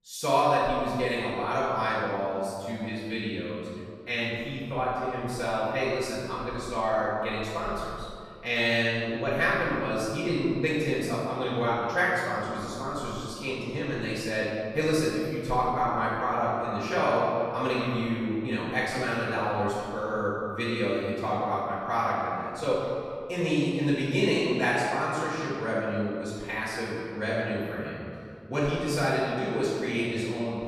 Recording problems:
room echo; strong; dies away in 2 s
off-mic speech; far
echo of what is said; noticeable; from 15 s on; 140 ms later, 15 dB below the speech

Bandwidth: 14 kHz